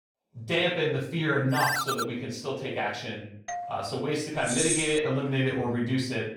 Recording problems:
off-mic speech; far
room echo; noticeable; dies away in 0.6 s
phone ringing; loud; at 1.5 s; peak 1 dB above the speech
doorbell; noticeable; at 3.5 s; peak 8 dB below the speech
jangling keys; loud; at 4.5 s; peak 2 dB above the speech

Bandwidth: 17 kHz